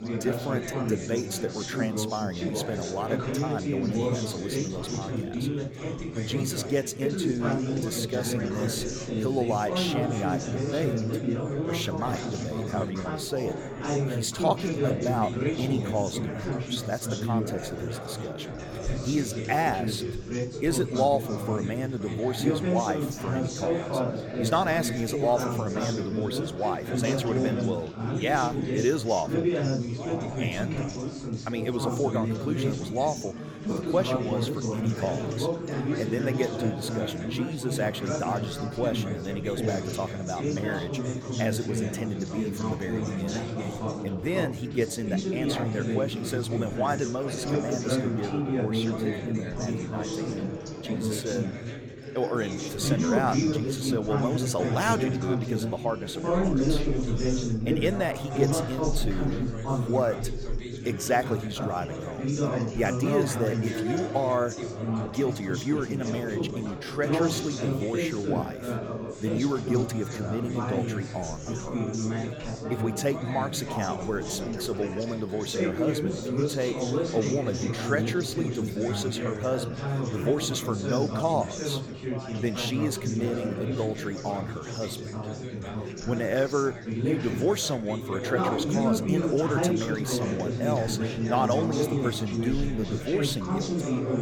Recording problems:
chatter from many people; very loud; throughout; as loud as the speech

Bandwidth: 17.5 kHz